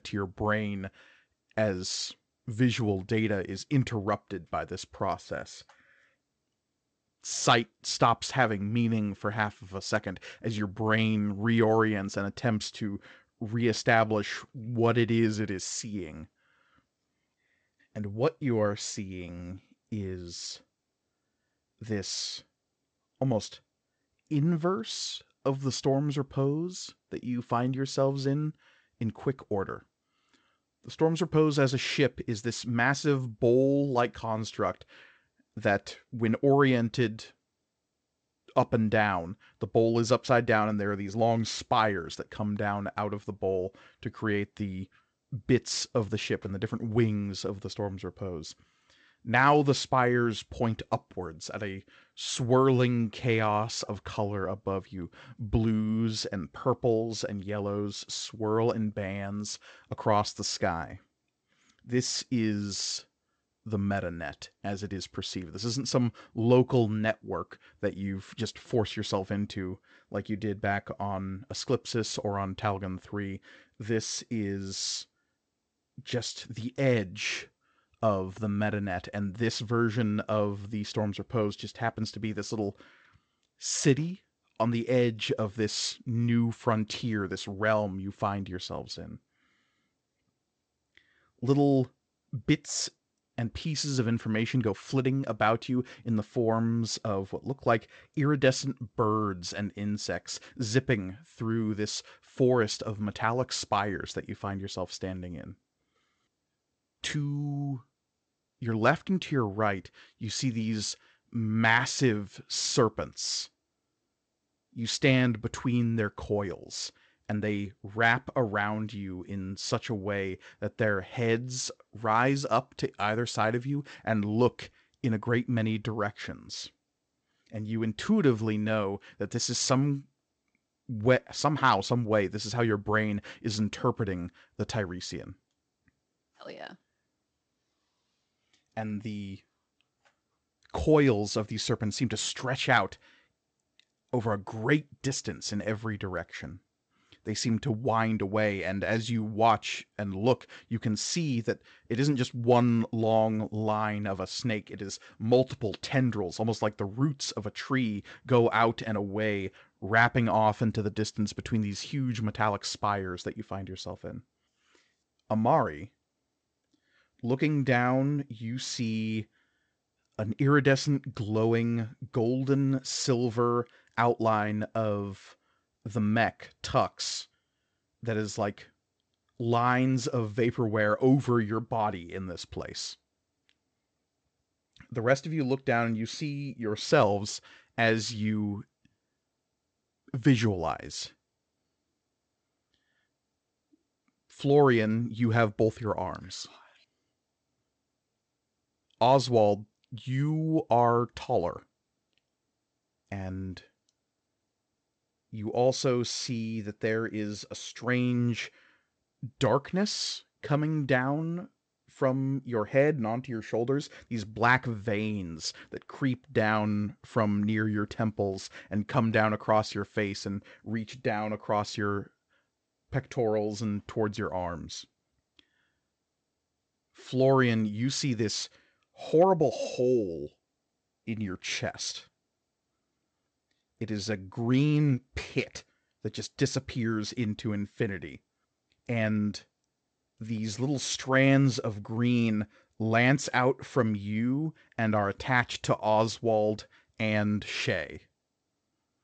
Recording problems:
garbled, watery; slightly; nothing above 8 kHz

